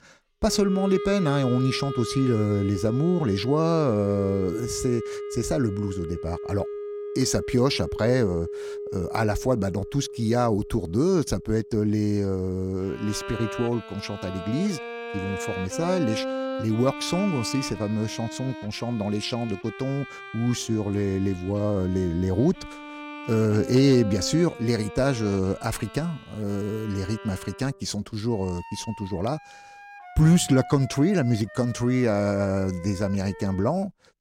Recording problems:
background music; noticeable; throughout; 10 dB below the speech

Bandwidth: 16.5 kHz